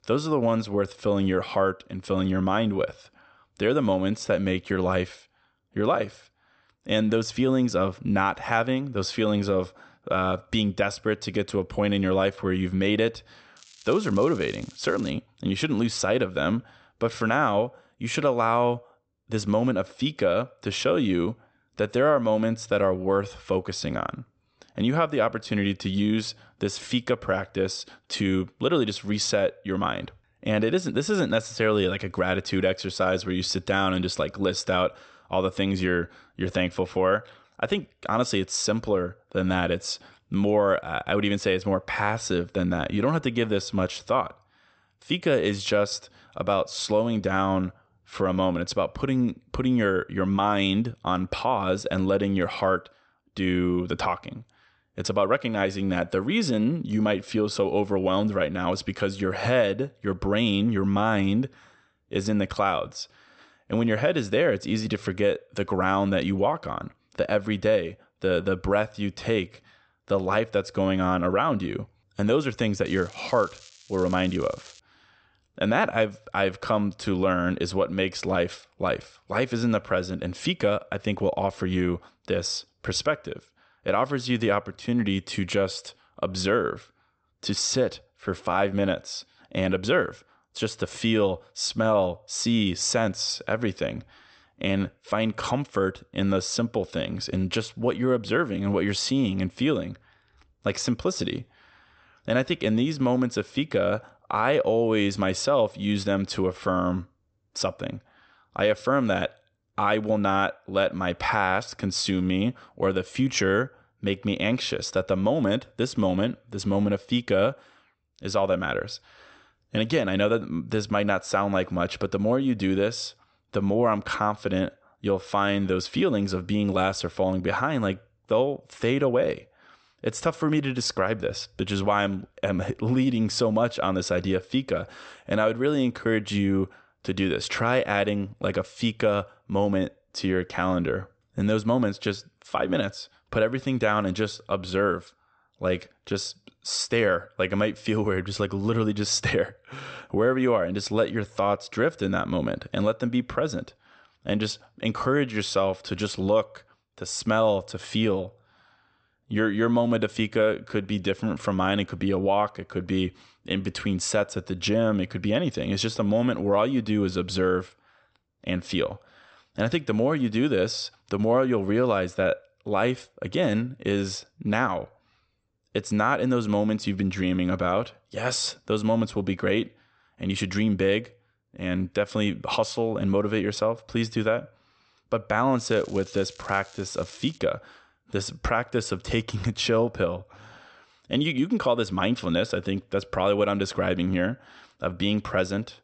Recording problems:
high frequencies cut off; noticeable; nothing above 8 kHz
crackling; faint; from 14 to 15 s, from 1:13 to 1:15 and from 3:06 to 3:07; 25 dB below the speech

